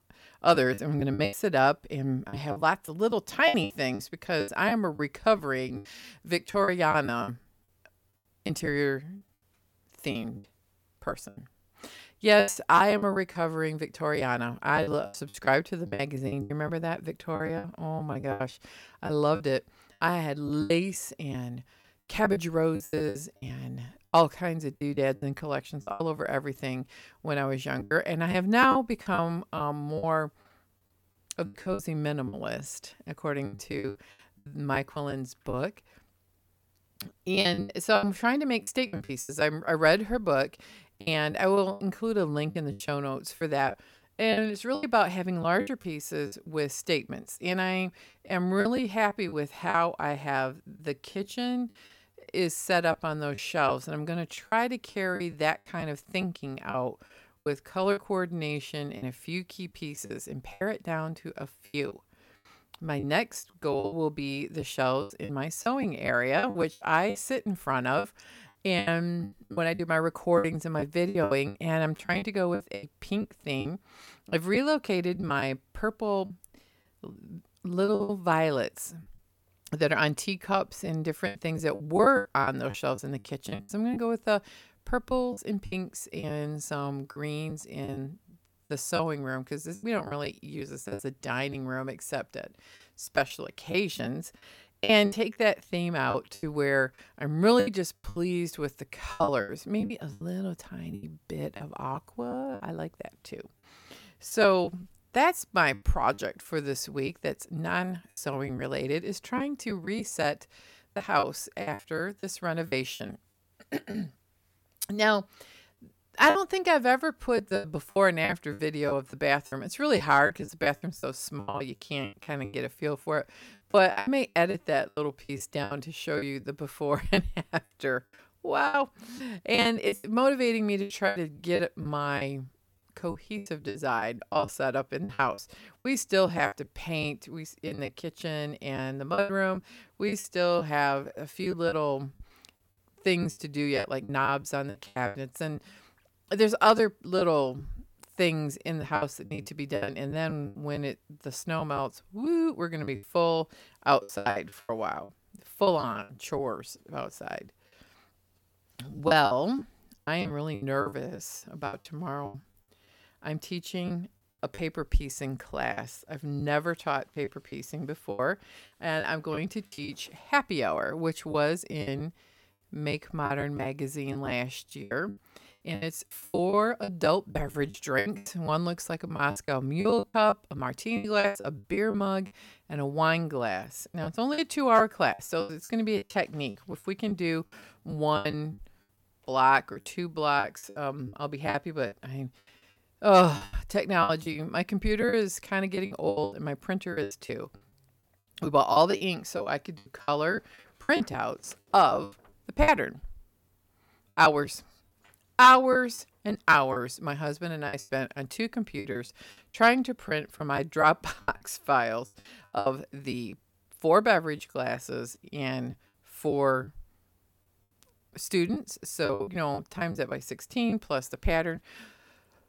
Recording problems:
choppy; very; 12% of the speech affected

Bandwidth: 17 kHz